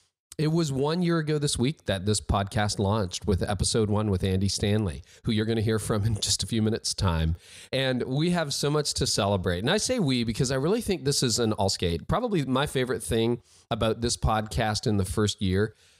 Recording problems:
uneven, jittery; strongly; from 2 to 15 s

